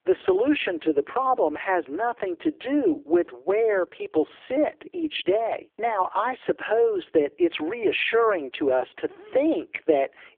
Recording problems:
phone-call audio; poor line; nothing above 3.5 kHz

